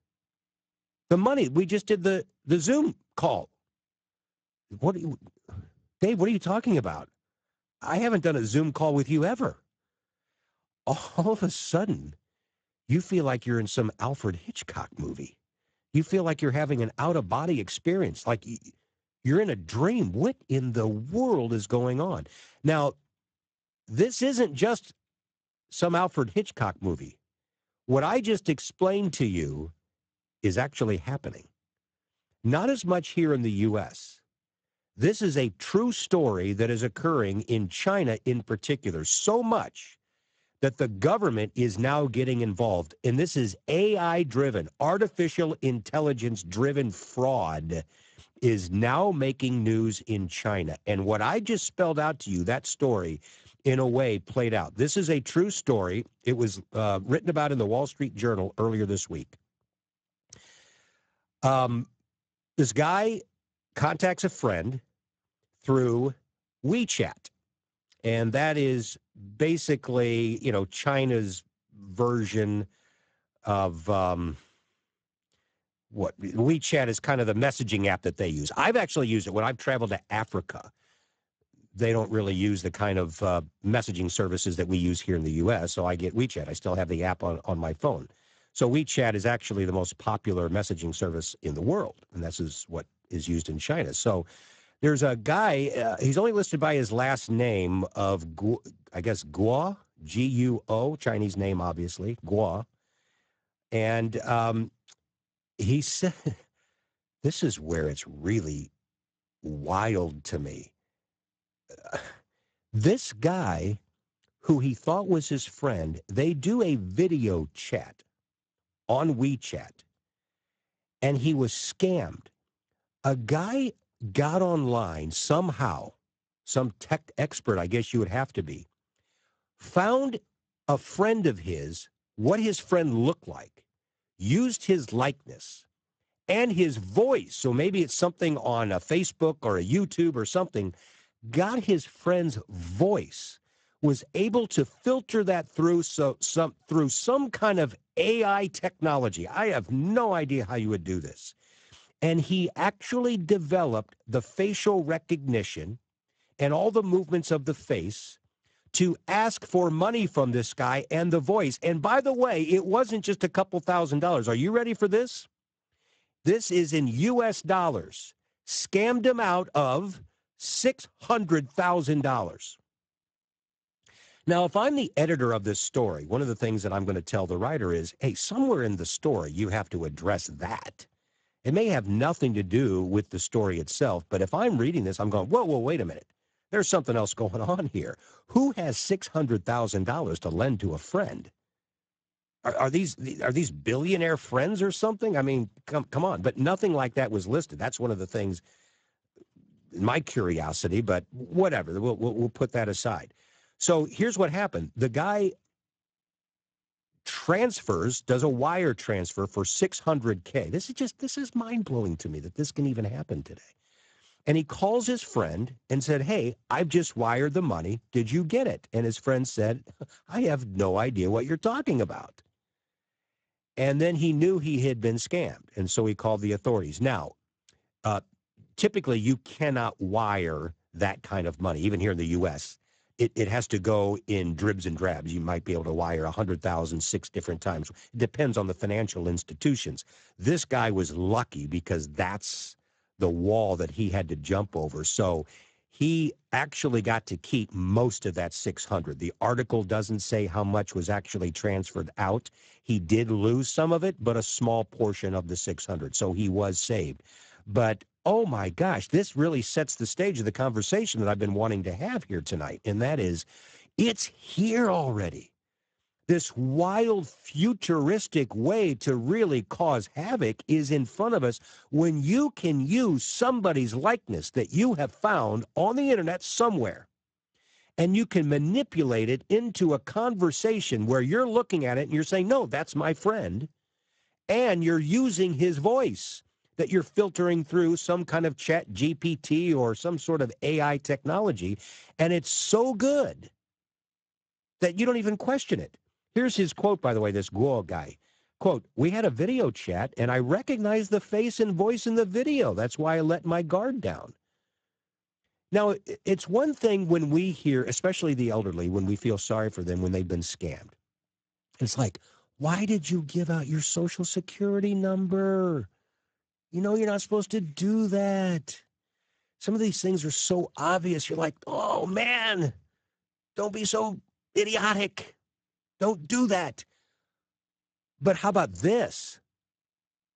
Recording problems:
garbled, watery; badly; nothing above 7.5 kHz

